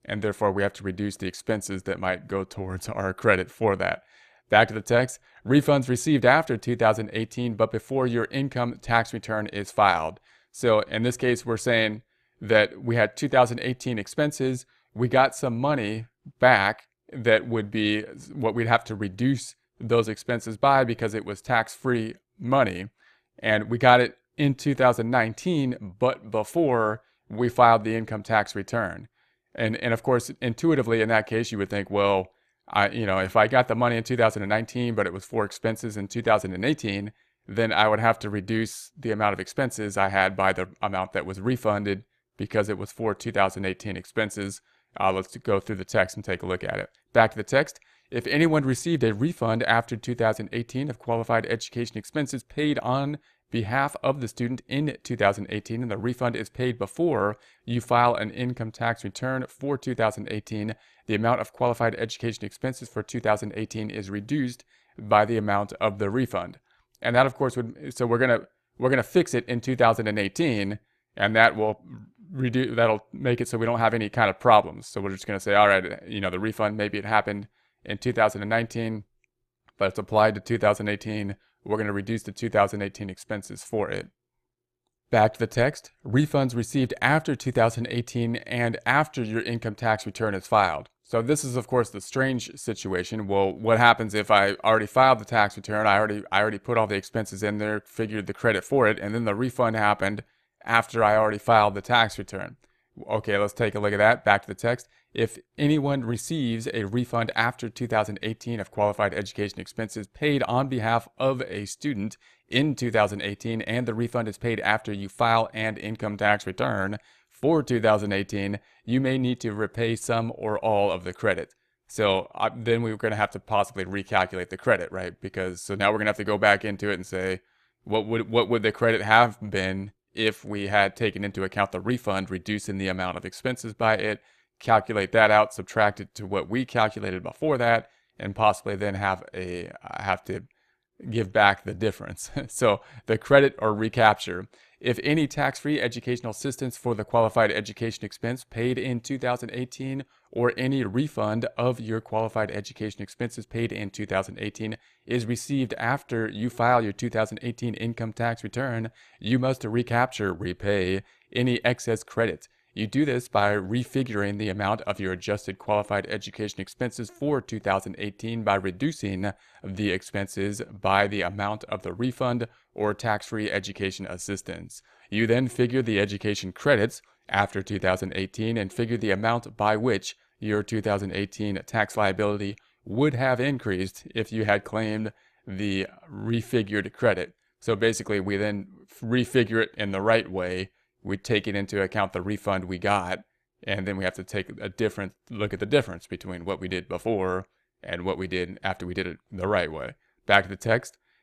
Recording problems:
none

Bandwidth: 14 kHz